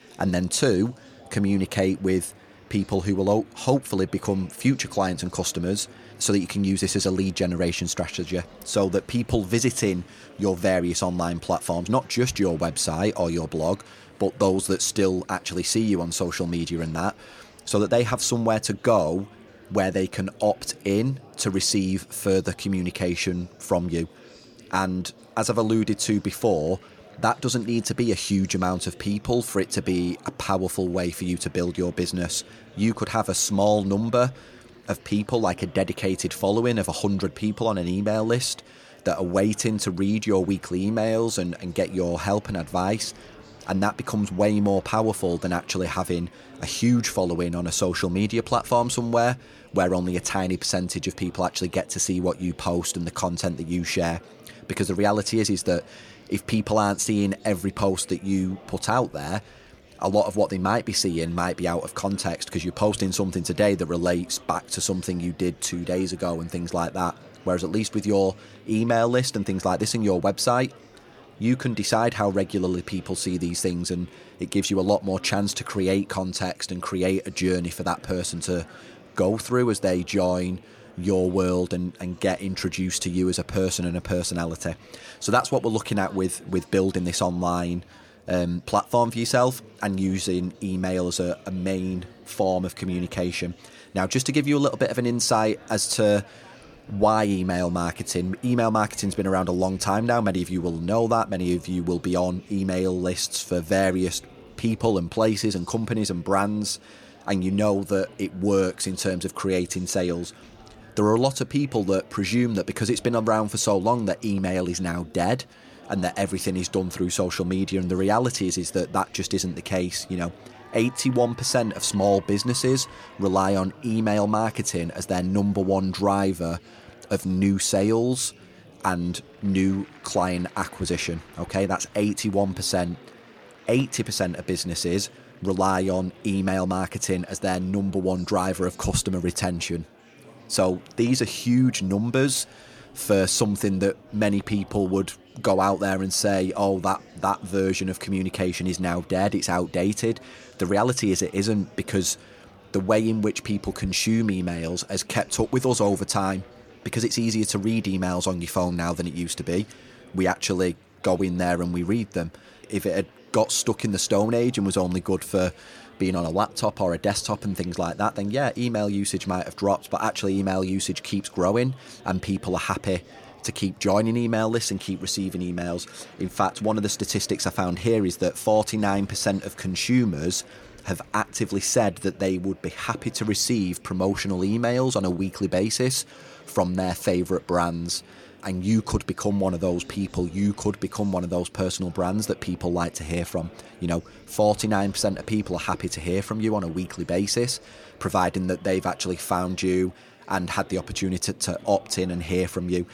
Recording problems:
murmuring crowd; faint; throughout; 25 dB below the speech

